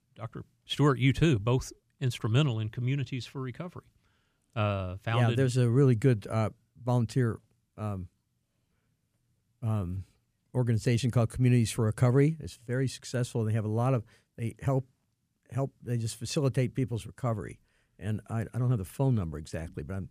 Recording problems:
none

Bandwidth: 15 kHz